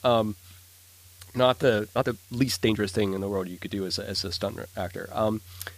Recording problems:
hiss; faint; throughout; 25 dB below the speech
uneven, jittery; strongly; from 1 to 5 s

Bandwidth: 15 kHz